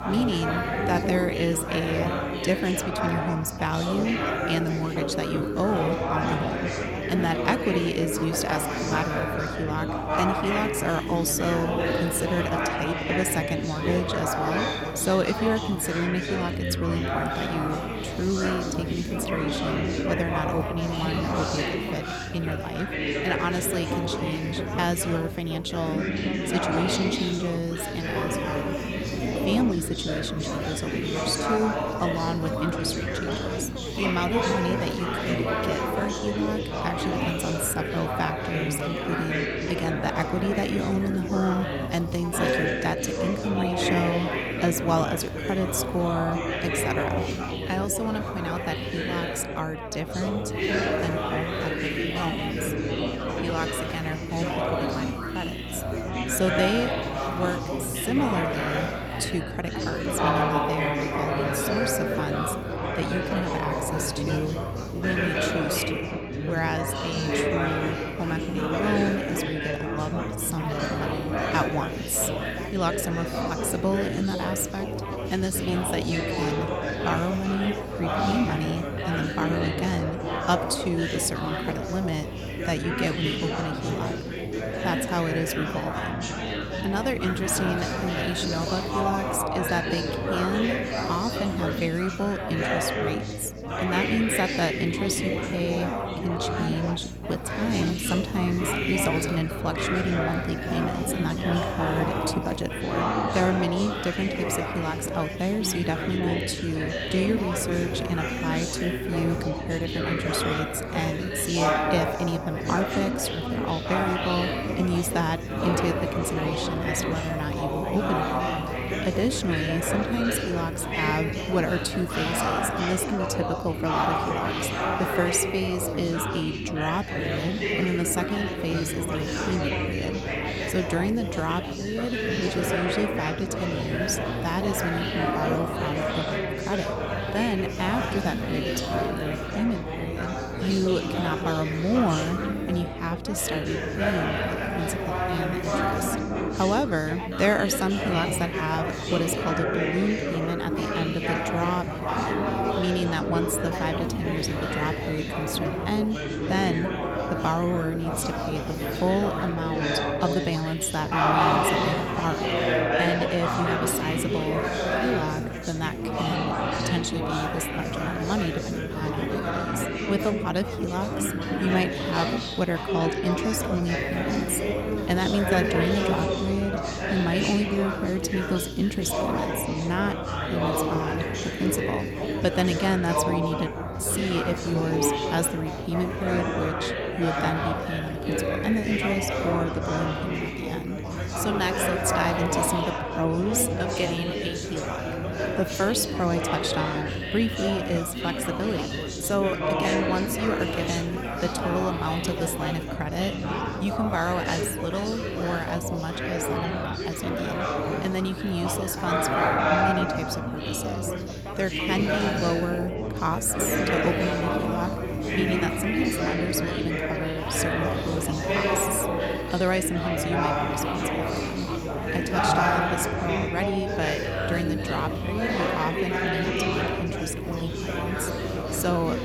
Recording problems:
chatter from many people; very loud; throughout; as loud as the speech
electrical hum; noticeable; throughout; 60 Hz, 15 dB below the speech

